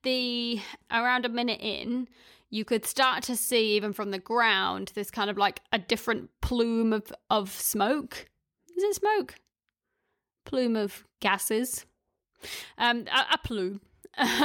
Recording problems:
abrupt cut into speech; at the end

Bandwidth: 17.5 kHz